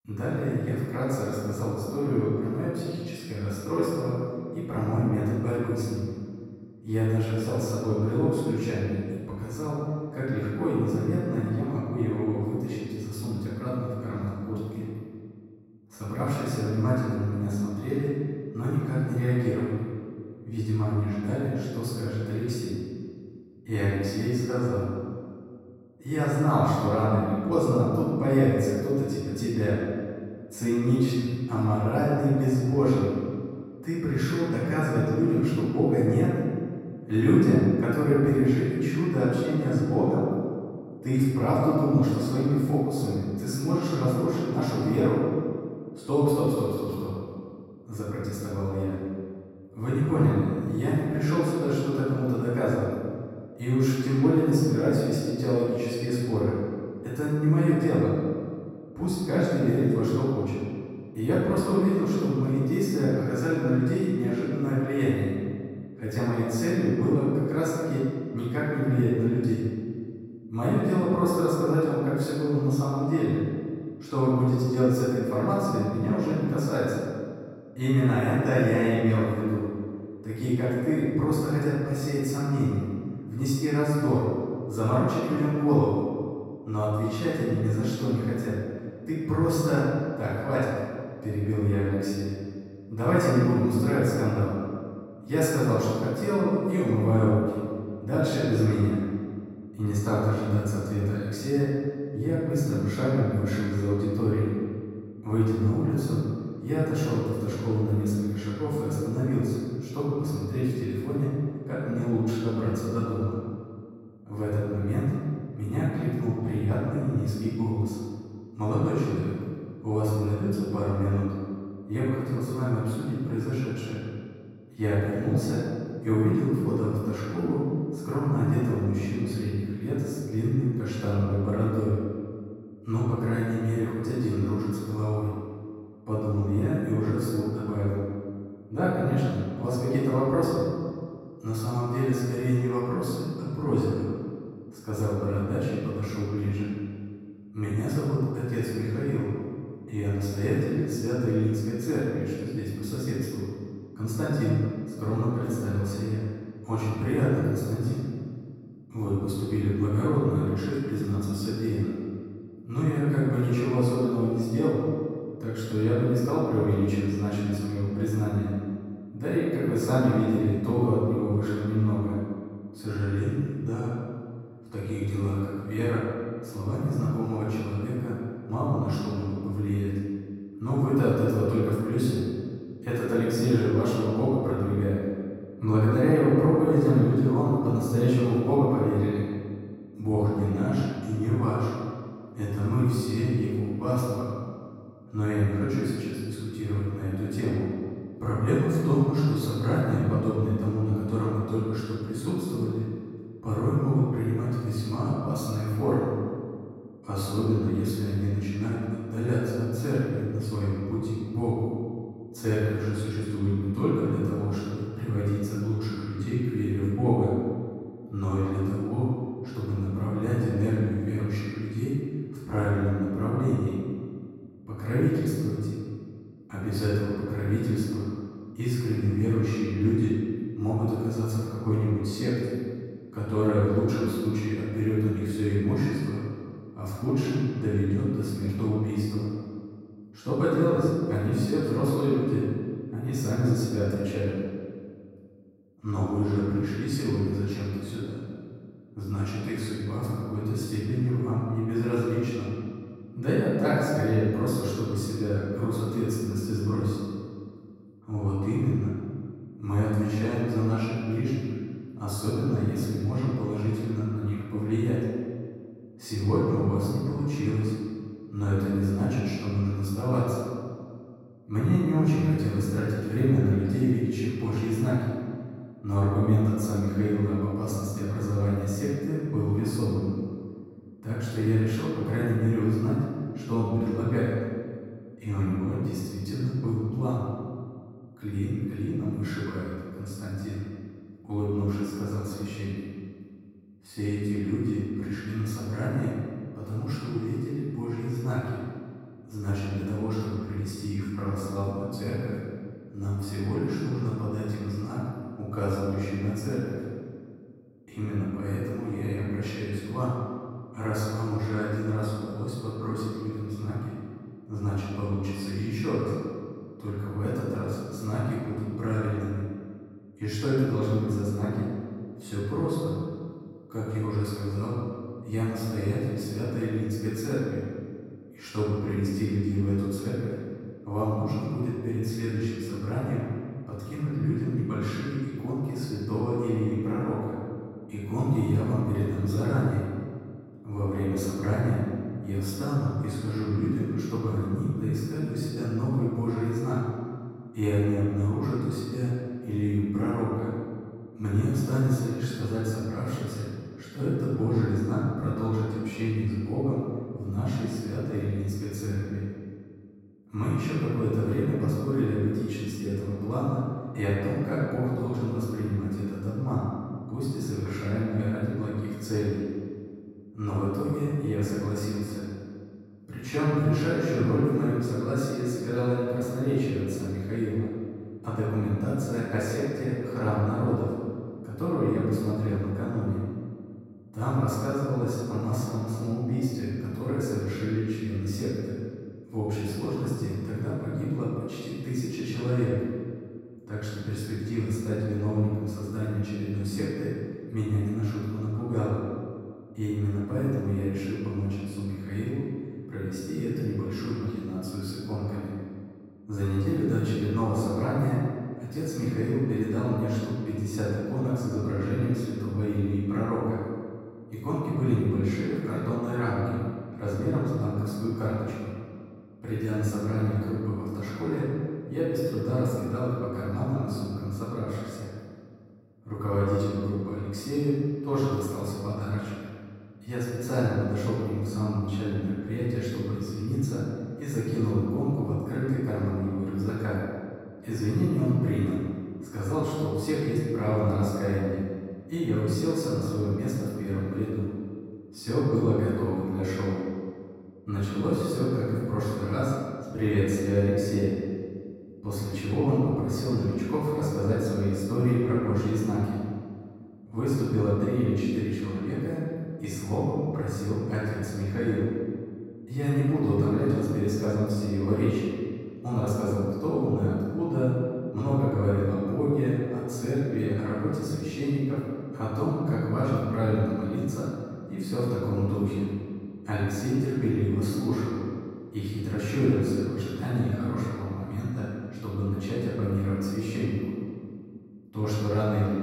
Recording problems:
room echo; strong; dies away in 1.8 s
off-mic speech; far

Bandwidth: 16 kHz